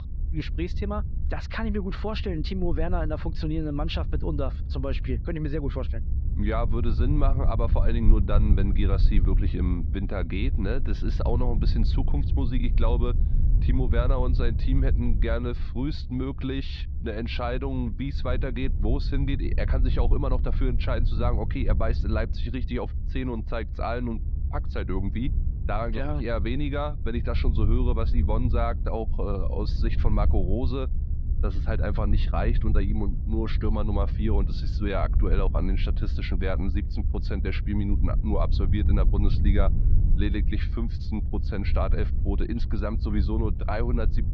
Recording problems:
muffled; very slightly; fading above 4 kHz
low rumble; noticeable; throughout; 10 dB below the speech

